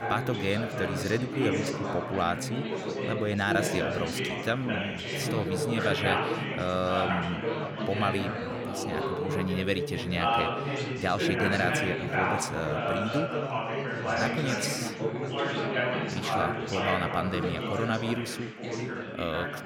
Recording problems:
chatter from many people; very loud; throughout; 1 dB above the speech

